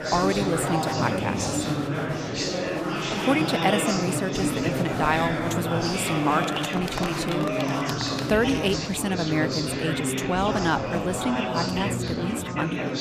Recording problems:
murmuring crowd; loud; throughout; as loud as the speech

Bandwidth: 15 kHz